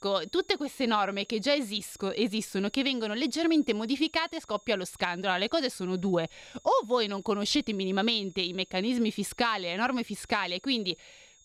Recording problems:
high-pitched whine; faint; throughout; 6.5 kHz, 30 dB below the speech

